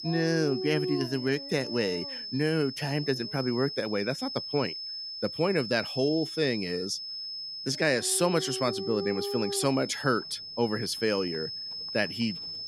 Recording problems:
high-pitched whine; loud; throughout; 5 kHz, 7 dB below the speech
animal sounds; loud; throughout; 8 dB below the speech

